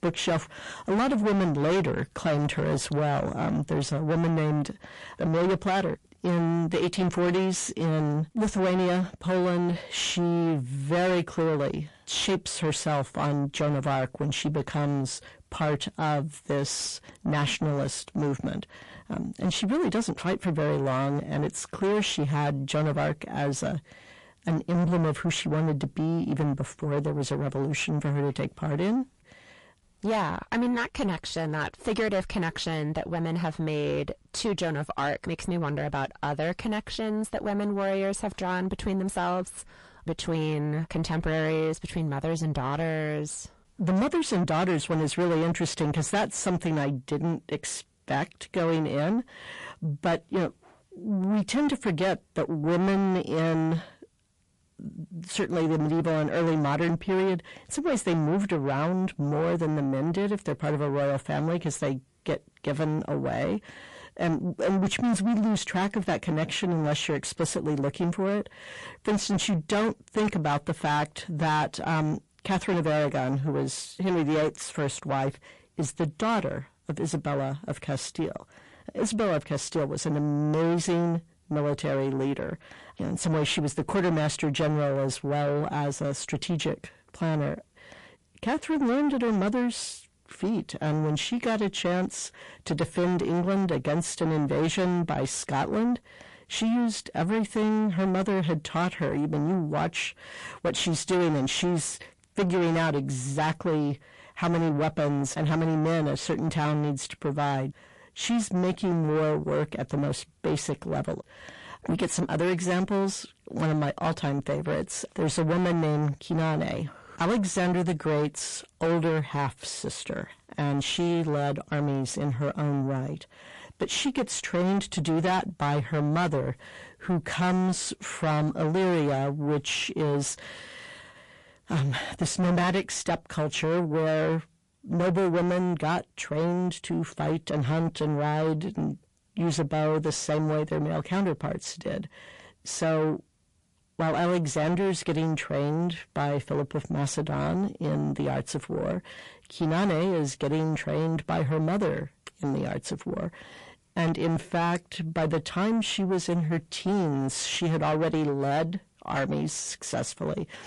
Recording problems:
distortion; heavy; 6 dB below the speech
garbled, watery; slightly

